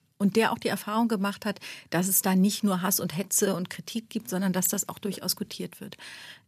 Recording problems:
none

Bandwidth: 14.5 kHz